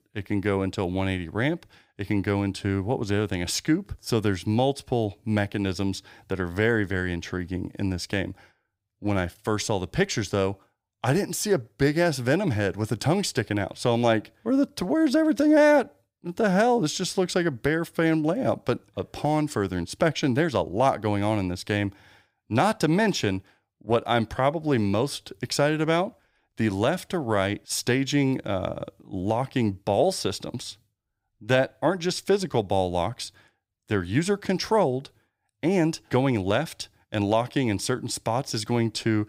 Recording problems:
none

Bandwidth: 15.5 kHz